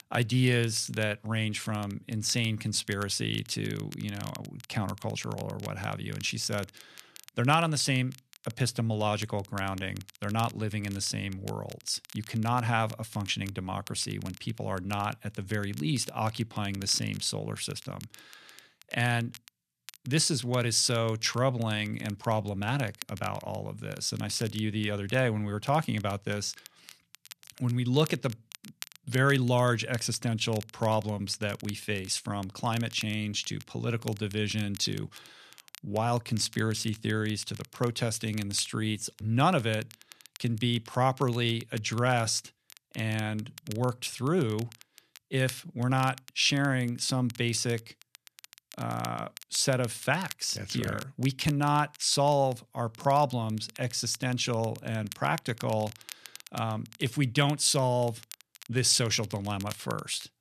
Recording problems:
crackle, like an old record; noticeable; 20 dB below the speech

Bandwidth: 14 kHz